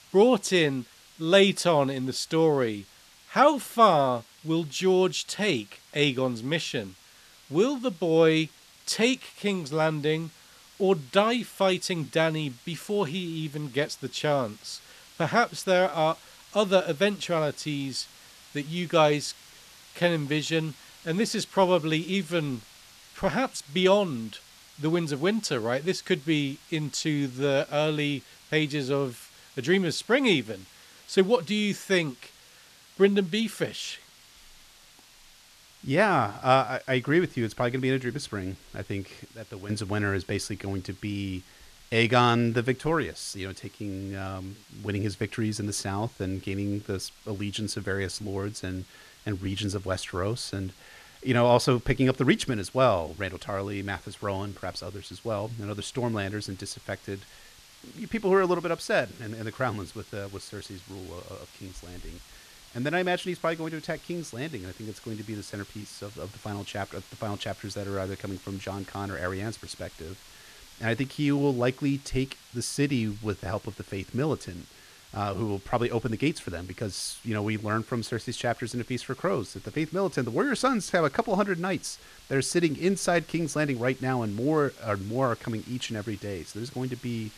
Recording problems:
hiss; faint; throughout; 25 dB below the speech

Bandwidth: 14 kHz